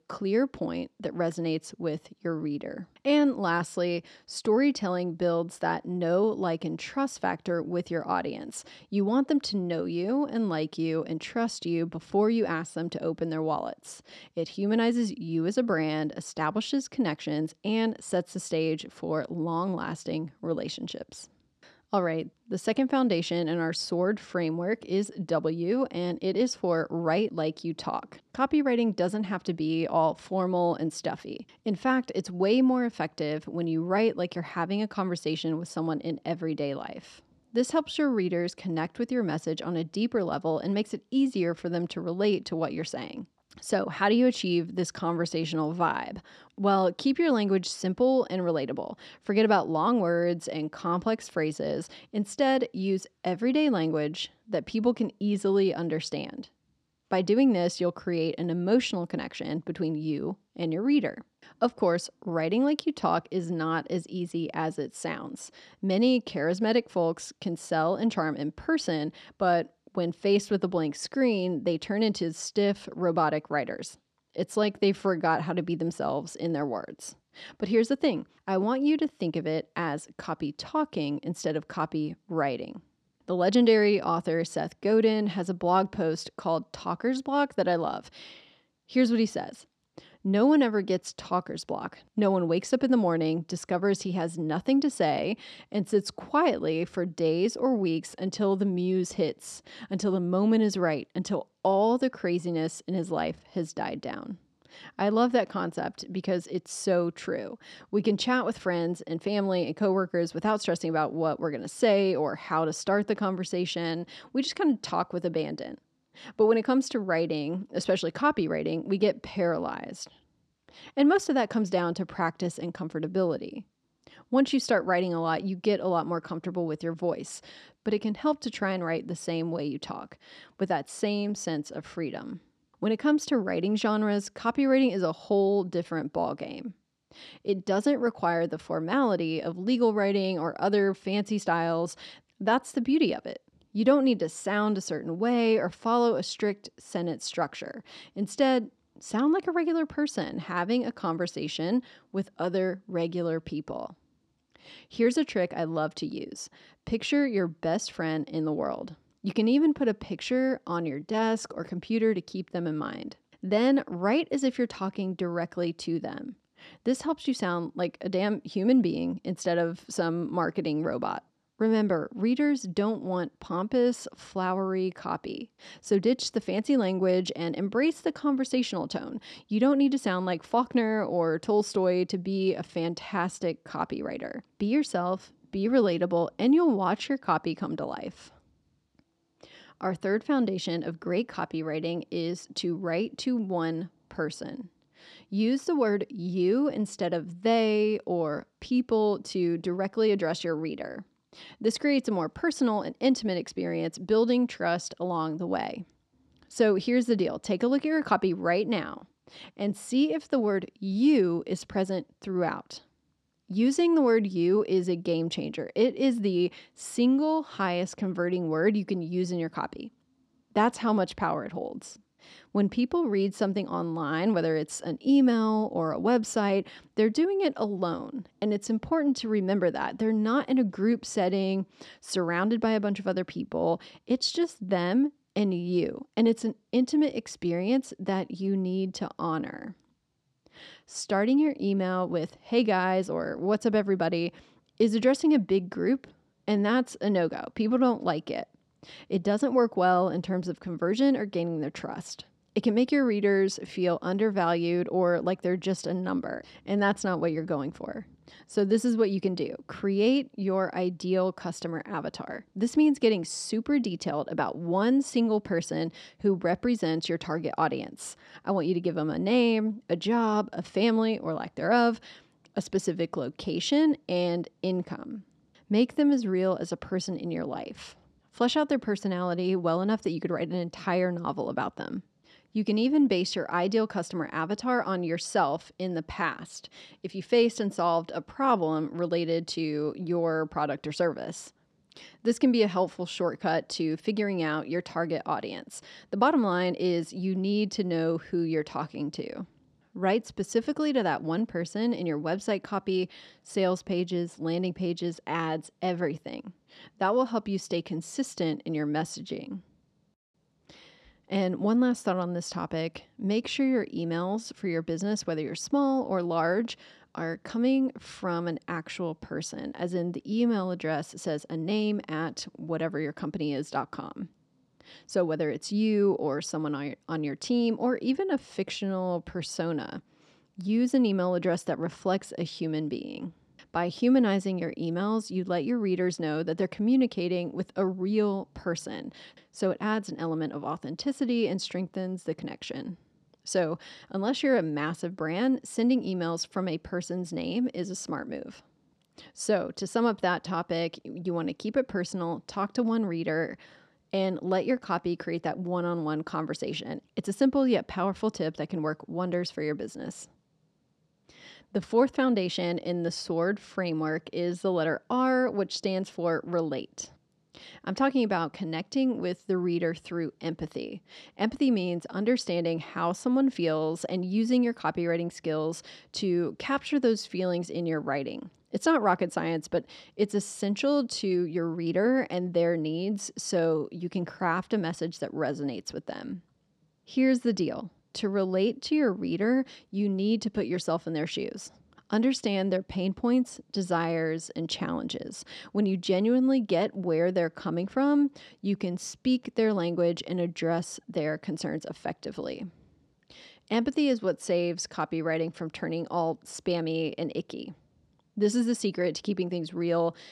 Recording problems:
none

